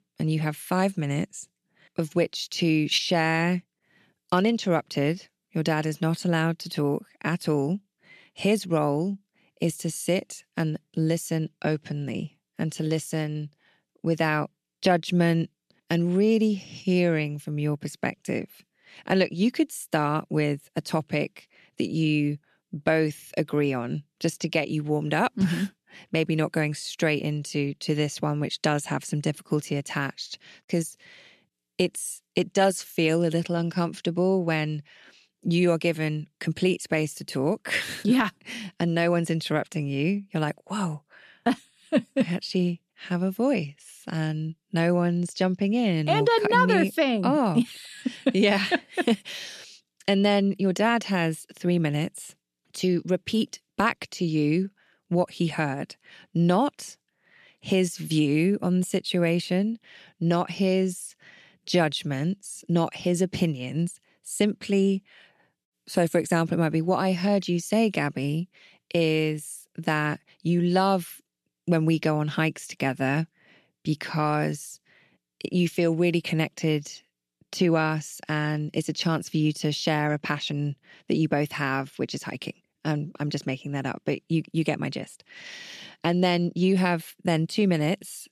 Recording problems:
none

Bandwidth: 13.5 kHz